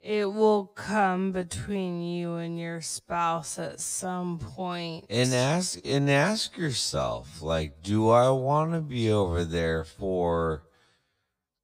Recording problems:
wrong speed, natural pitch; too slow; 0.5 times normal speed

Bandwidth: 15.5 kHz